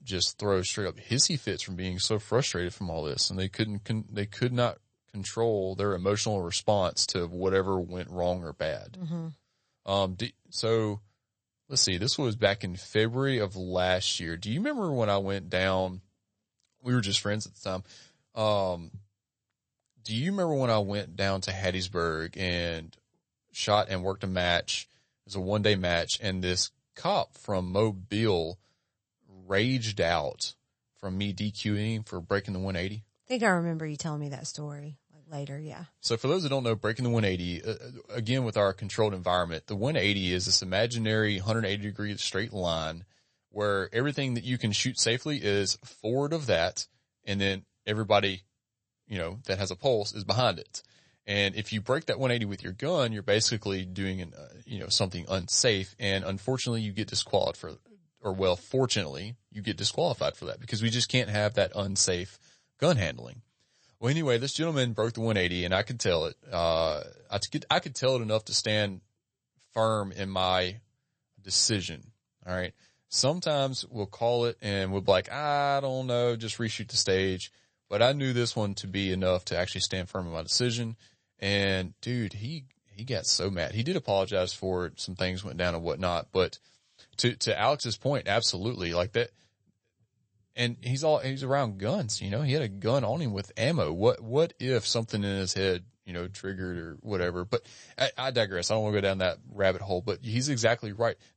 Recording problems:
garbled, watery; slightly; nothing above 8 kHz

